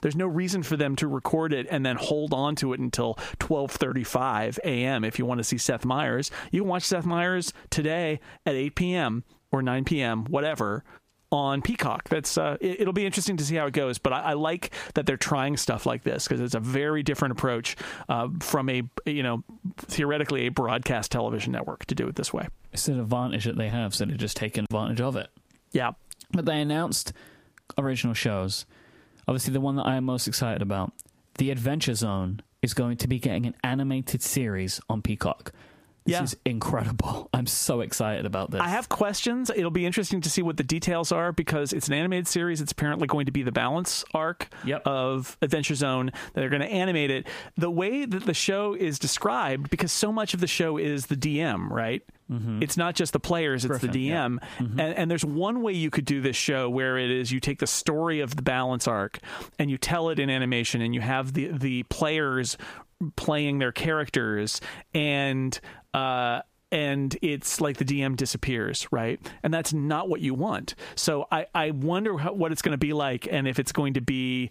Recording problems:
squashed, flat; heavily

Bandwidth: 15 kHz